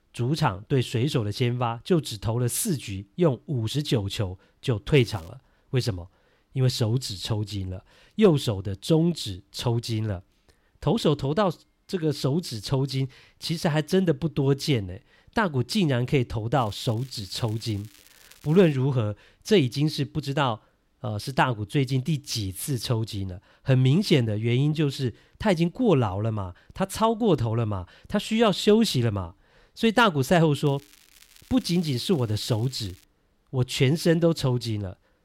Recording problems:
crackling; faint; at 5 s, from 17 to 19 s and from 31 to 33 s; 25 dB below the speech

